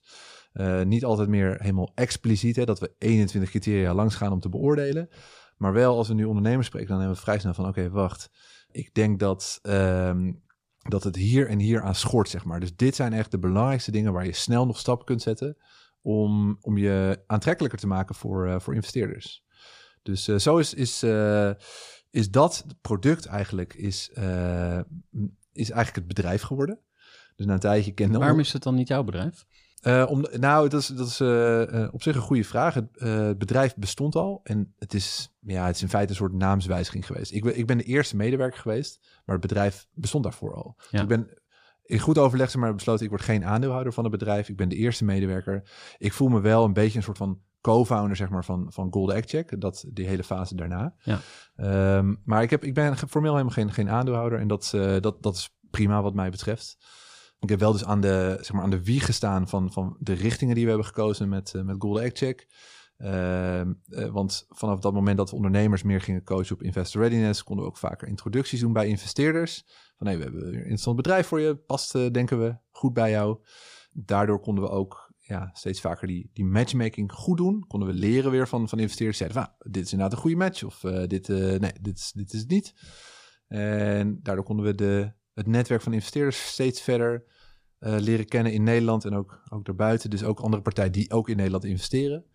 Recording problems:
none

